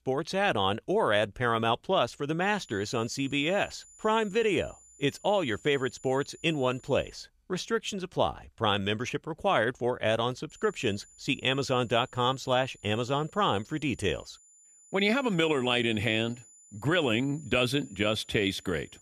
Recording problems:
high-pitched whine; faint; from 2.5 to 7 s and from 11 s on; 7 kHz, 25 dB below the speech

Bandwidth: 14.5 kHz